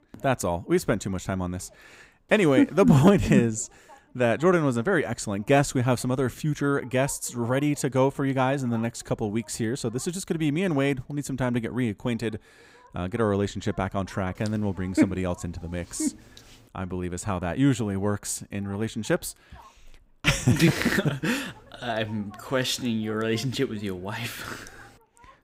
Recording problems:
voice in the background; faint; throughout; 30 dB below the speech

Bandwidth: 15.5 kHz